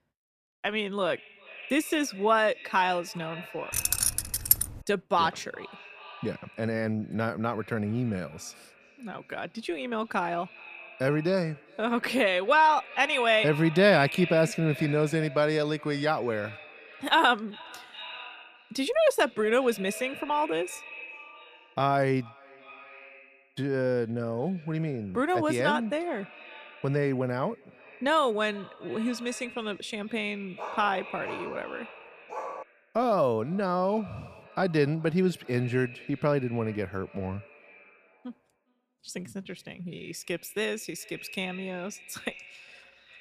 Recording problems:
echo of what is said; noticeable; throughout; 400 ms later, 15 dB below the speech
jangling keys; loud; at 3.5 s; peak 5 dB above the speech
dog barking; noticeable; from 31 to 33 s; peak 10 dB below the speech

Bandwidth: 14.5 kHz